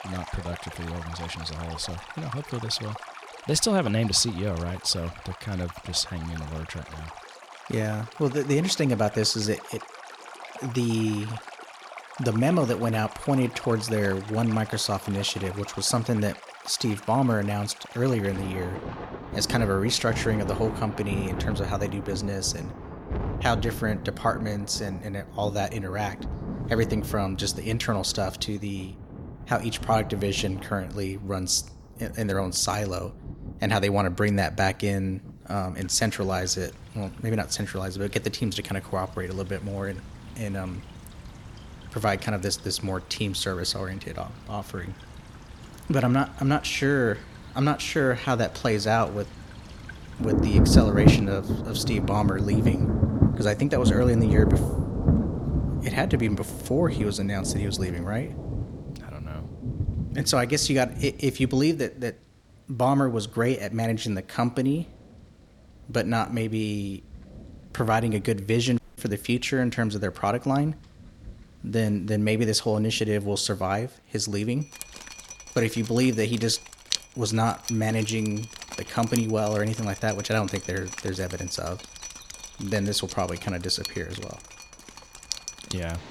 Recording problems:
rain or running water; loud; throughout; 5 dB below the speech
audio cutting out; at 1:09

